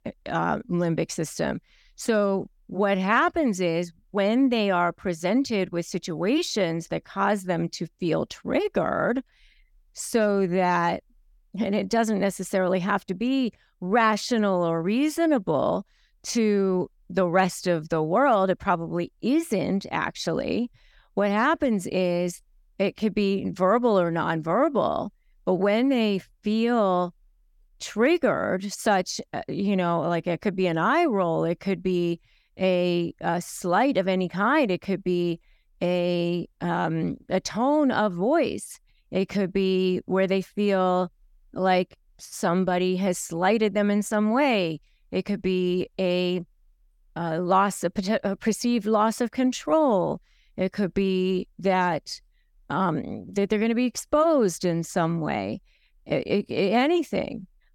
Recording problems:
none

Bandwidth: 17.5 kHz